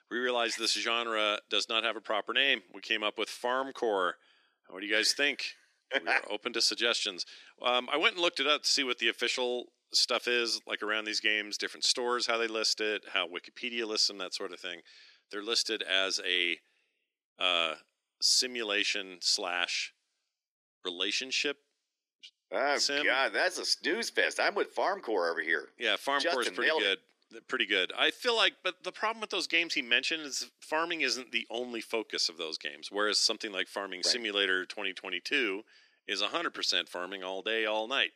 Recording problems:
thin; very; fading below 300 Hz

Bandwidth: 14 kHz